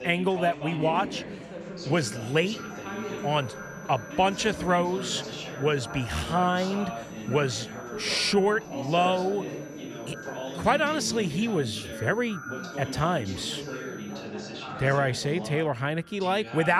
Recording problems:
echo of what is said; faint; throughout; 520 ms later, 20 dB below the speech
background chatter; loud; throughout; 3 voices, 10 dB below the speech
high-pitched whine; faint; from 2 to 14 s; 6 kHz, 25 dB below the speech
traffic noise; faint; throughout; 20 dB below the speech
abrupt cut into speech; at the end

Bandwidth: 14.5 kHz